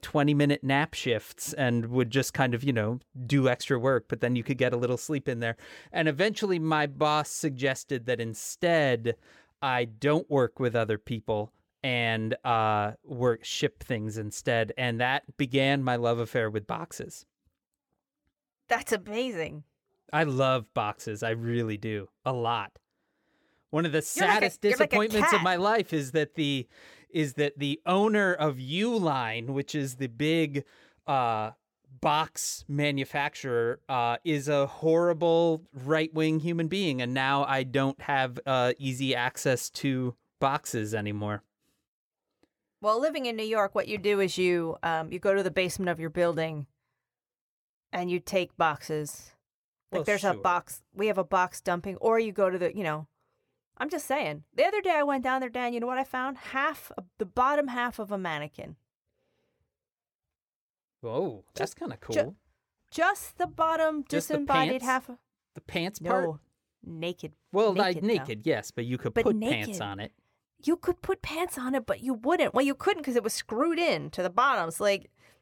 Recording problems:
none

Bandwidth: 17.5 kHz